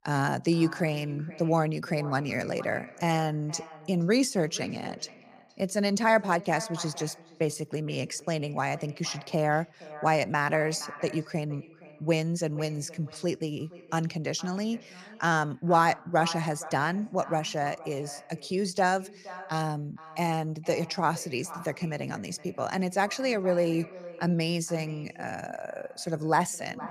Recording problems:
echo of what is said; noticeable; throughout; 470 ms later, 15 dB below the speech

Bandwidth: 15 kHz